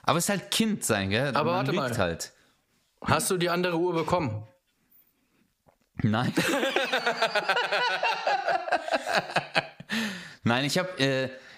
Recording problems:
squashed, flat; somewhat

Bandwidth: 15 kHz